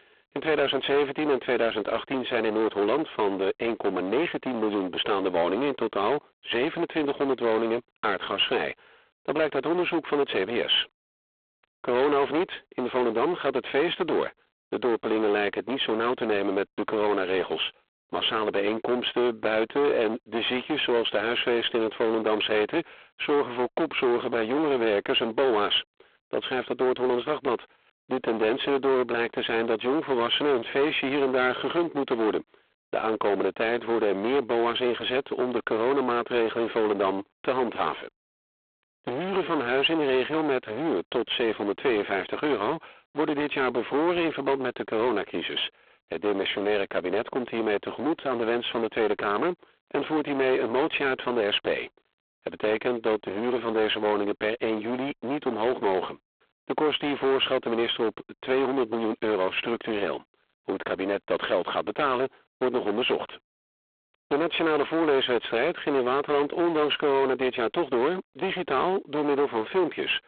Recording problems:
phone-call audio; poor line
distortion; heavy; 21% of the sound clipped

